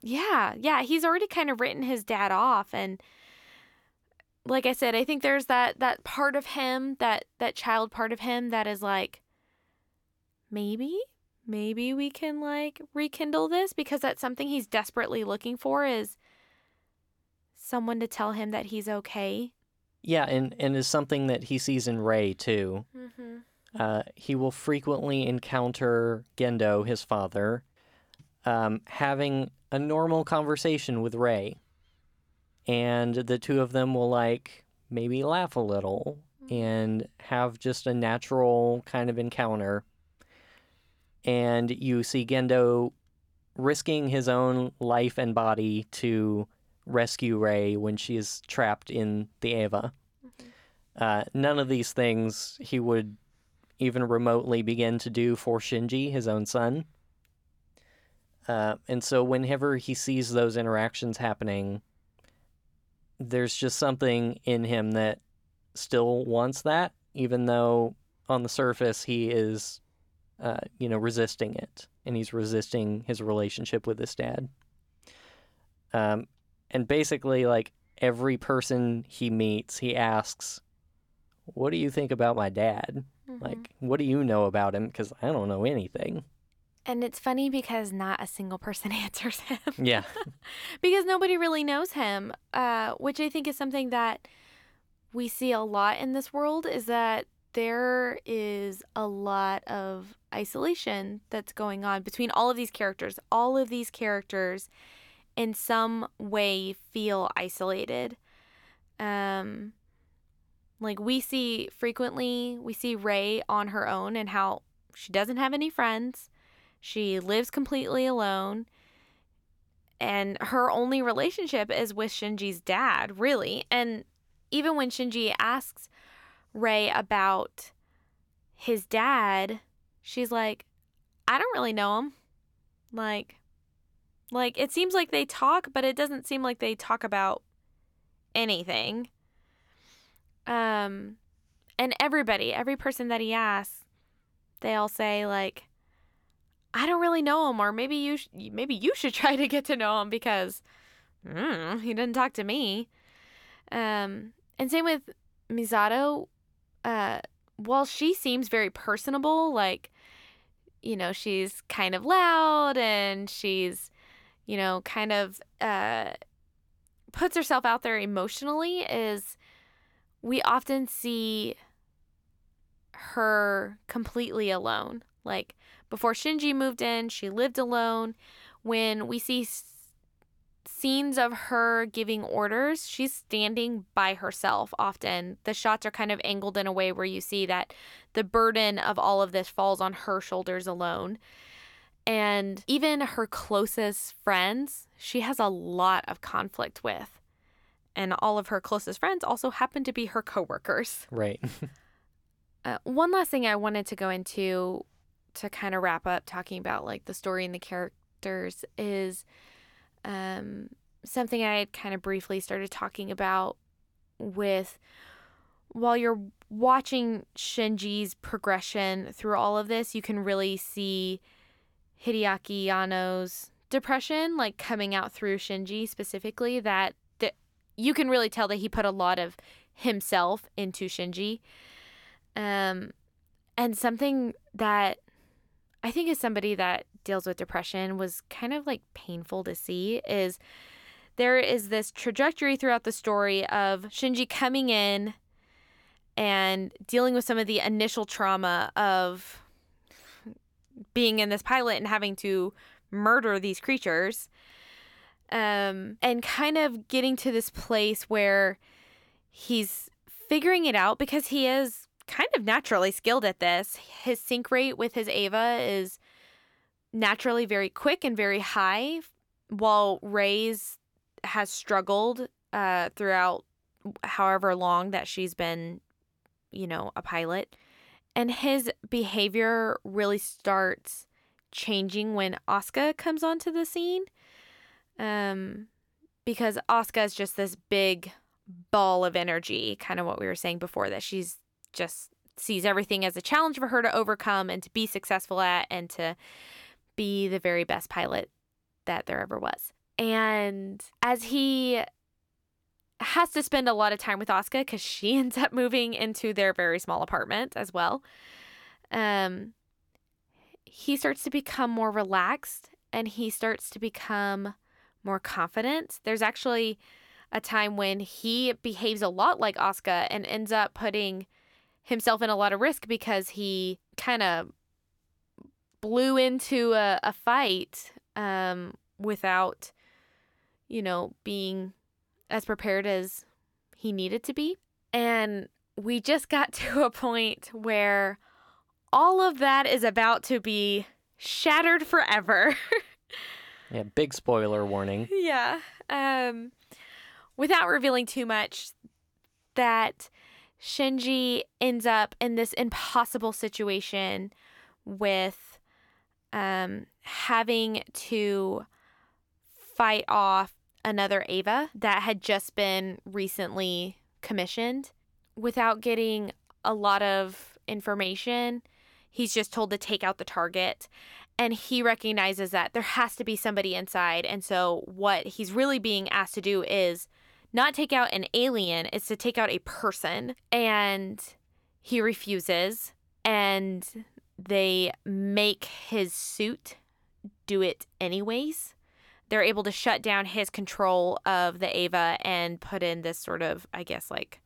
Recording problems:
none

